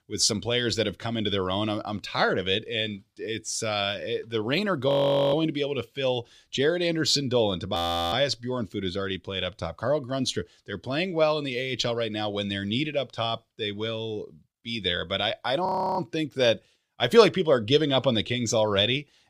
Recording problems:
audio freezing; at 5 s, at 8 s and at 16 s

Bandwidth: 15 kHz